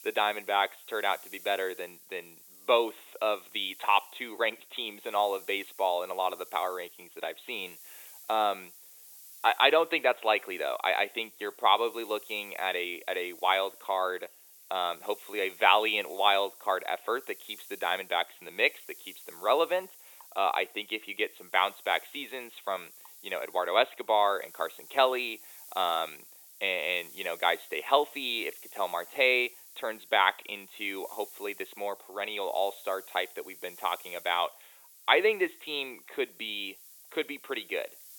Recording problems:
thin; very; fading below 400 Hz
high frequencies cut off; severe; nothing above 4 kHz
hiss; noticeable; throughout; 20 dB below the speech

